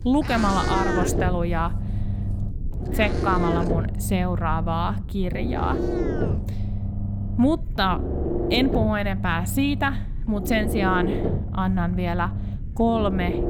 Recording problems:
low rumble; loud; throughout; 7 dB below the speech
animal sounds; noticeable; throughout; 10 dB below the speech

